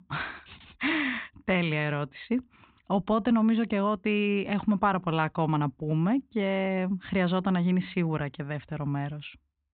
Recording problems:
high frequencies cut off; severe; nothing above 4 kHz

